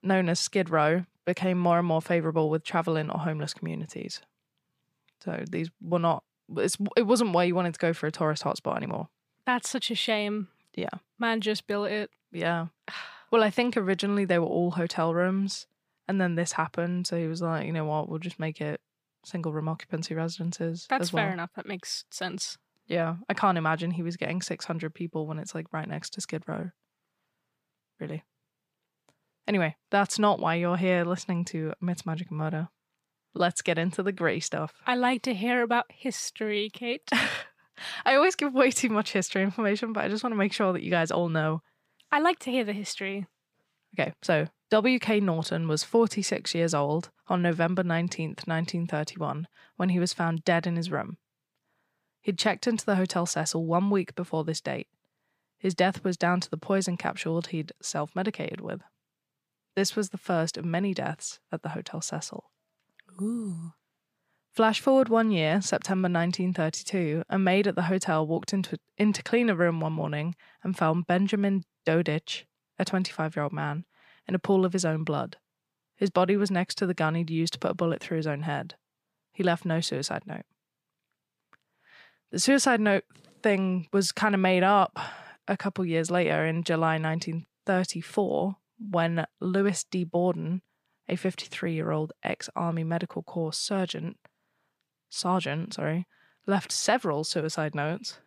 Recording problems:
none

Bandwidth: 15 kHz